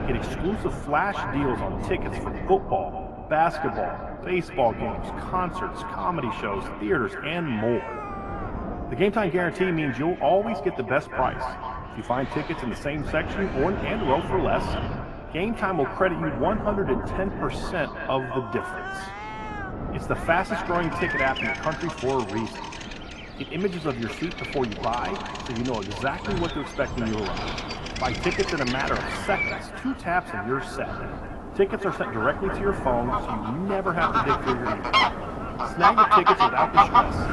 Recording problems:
echo of what is said; strong; throughout; 220 ms later, 9 dB below the speech
muffled; slightly; fading above 3 kHz
garbled, watery; slightly; nothing above 11.5 kHz
animal sounds; very loud; throughout; 1 dB above the speech
wind noise on the microphone; occasional gusts; 10 dB below the speech

